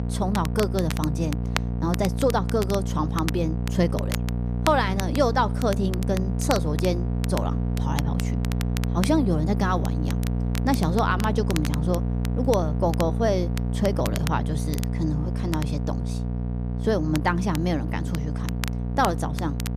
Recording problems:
electrical hum; loud; throughout; 60 Hz, 10 dB below the speech
crackle, like an old record; noticeable; 10 dB below the speech

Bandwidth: 14.5 kHz